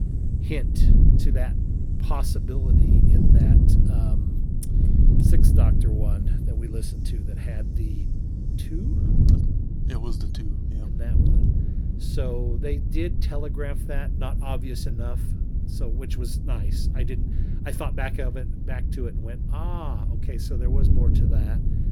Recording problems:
wind noise on the microphone; heavy; as loud as the speech
hiss; faint; throughout; 25 dB below the speech

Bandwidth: 17 kHz